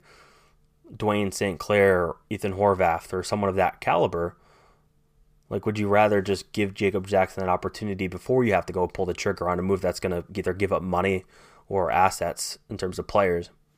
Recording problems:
none

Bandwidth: 15 kHz